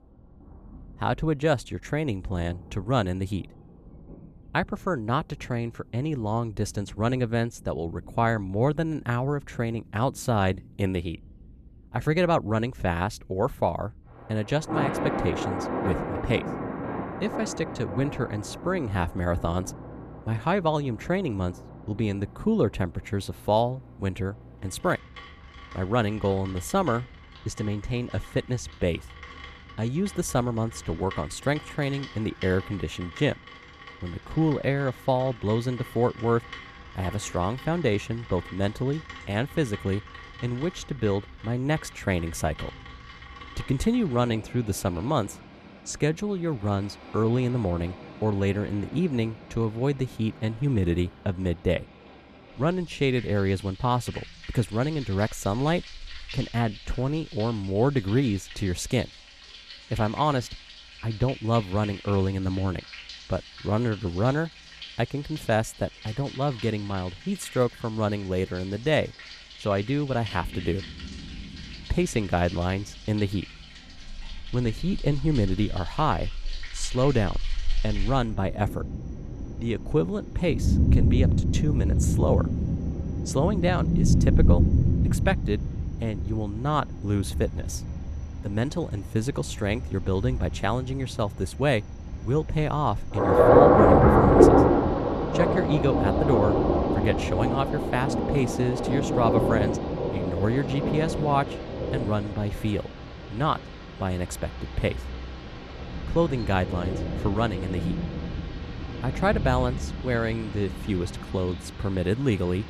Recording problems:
rain or running water; very loud; throughout; 1 dB above the speech

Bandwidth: 14 kHz